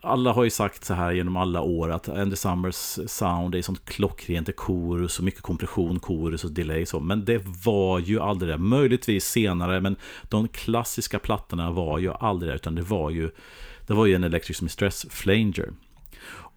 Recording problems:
none

